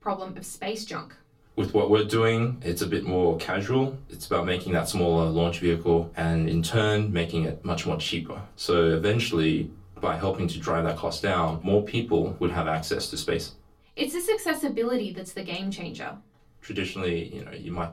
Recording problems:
off-mic speech; far
room echo; very slight; dies away in 0.2 s

